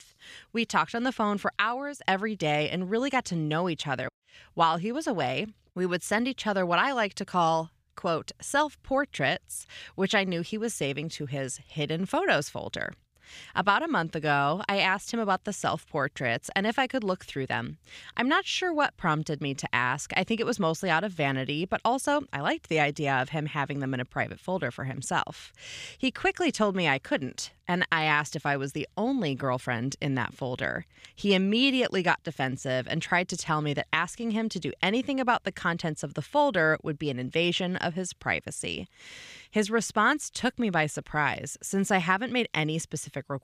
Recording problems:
none

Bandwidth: 15 kHz